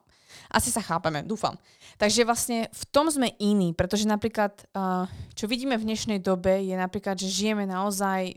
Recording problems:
none

